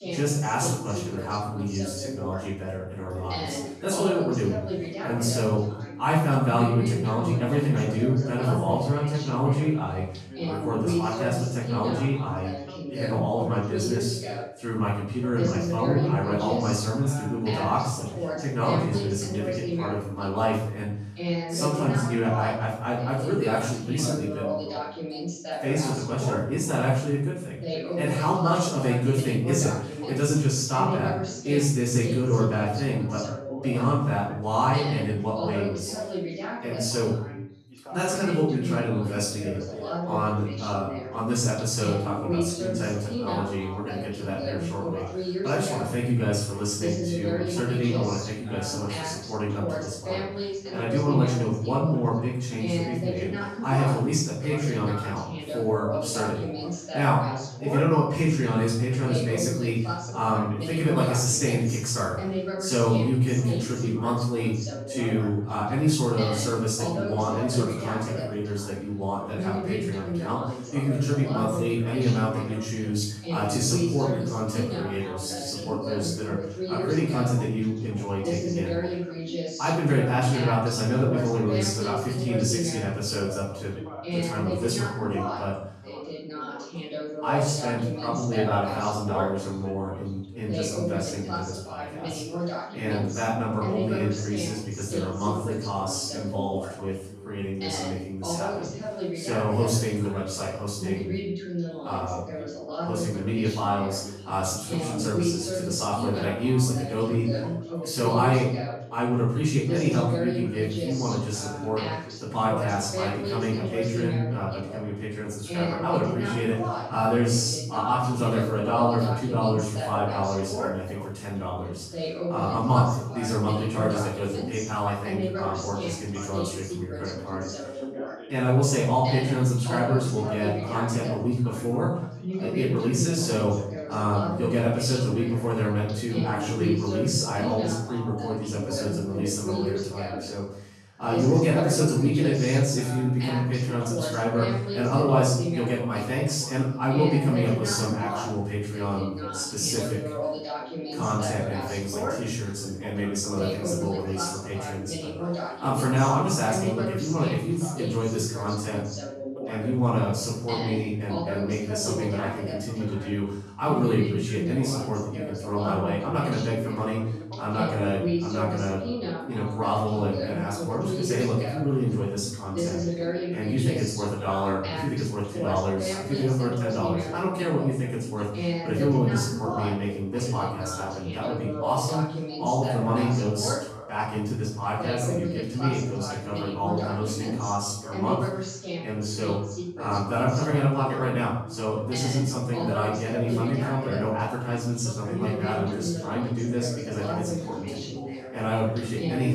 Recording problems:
off-mic speech; far
room echo; noticeable; dies away in 0.6 s
background chatter; loud; throughout; 2 voices, 6 dB below the speech
abrupt cut into speech; at the end

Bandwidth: 14.5 kHz